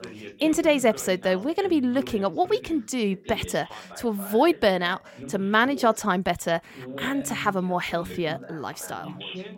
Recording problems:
background chatter; noticeable; throughout; 2 voices, 15 dB below the speech

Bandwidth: 16.5 kHz